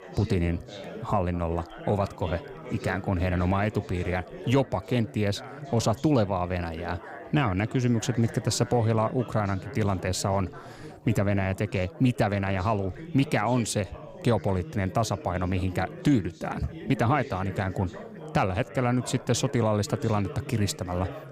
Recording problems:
chatter from many people; noticeable; throughout; 15 dB below the speech

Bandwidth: 15.5 kHz